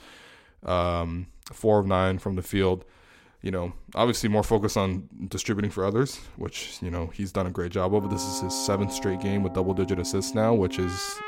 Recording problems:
background music; loud; from 8 s on; 10 dB below the speech

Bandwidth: 16 kHz